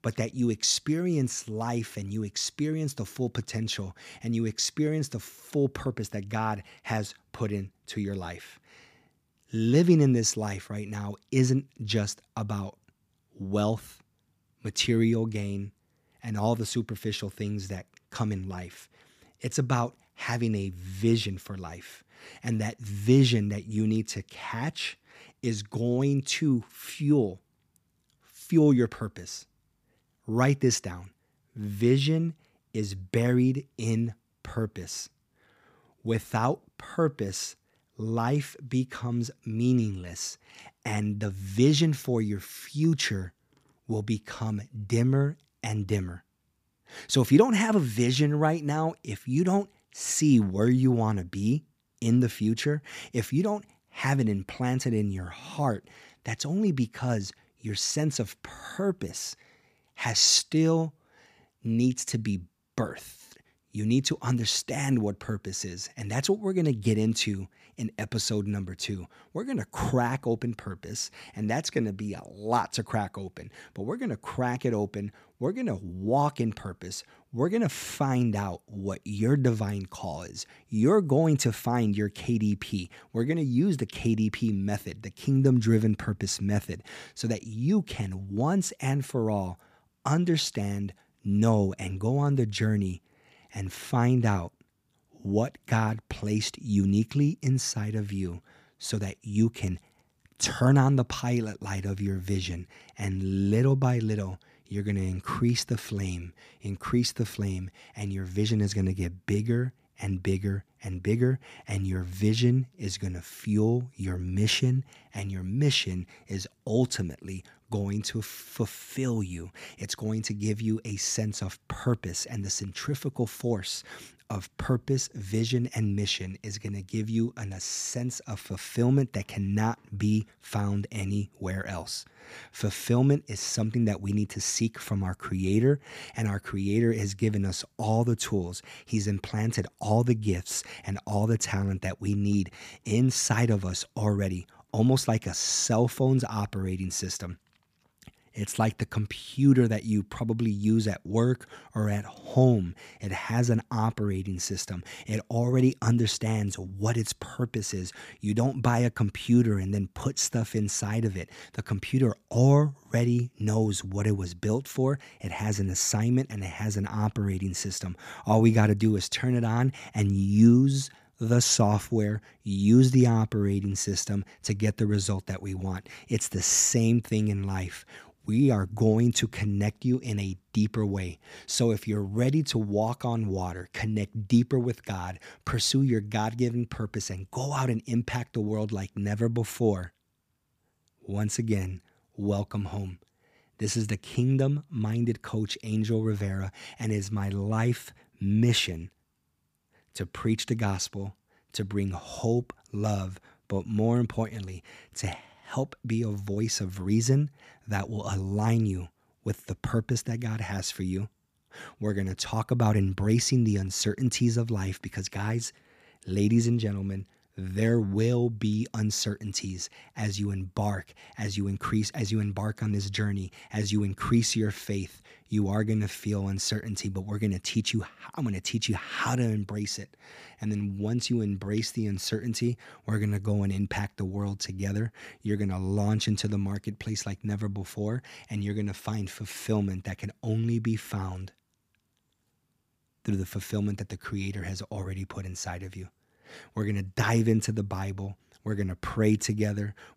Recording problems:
none

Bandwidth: 15 kHz